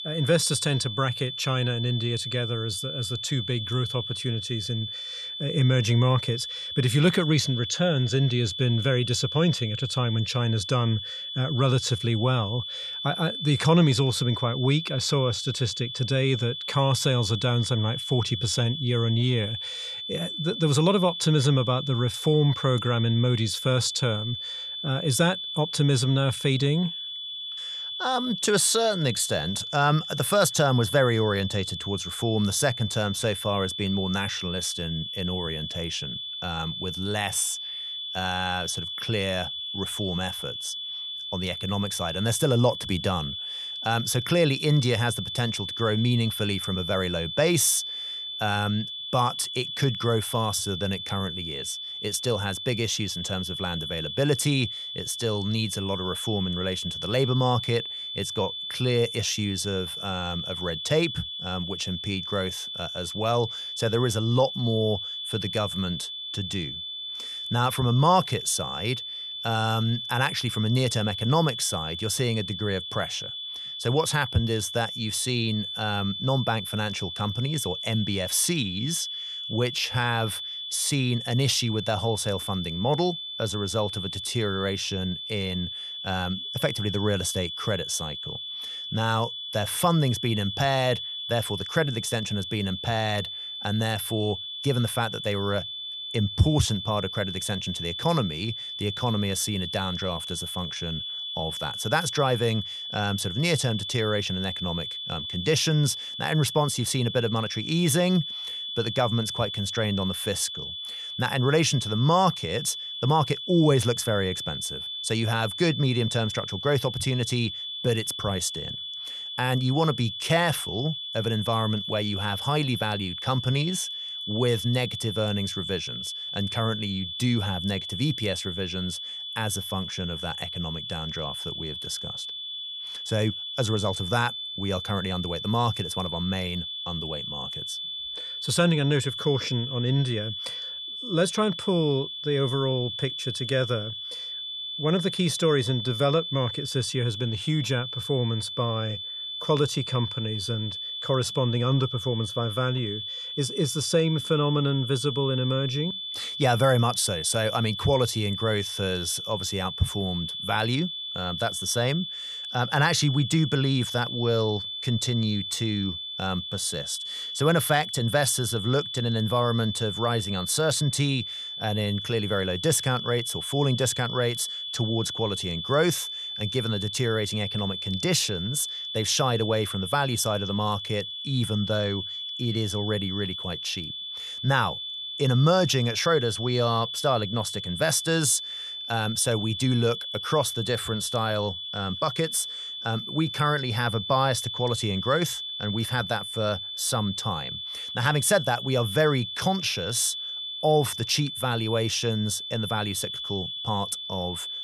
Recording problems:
high-pitched whine; loud; throughout; 3.5 kHz, 5 dB below the speech

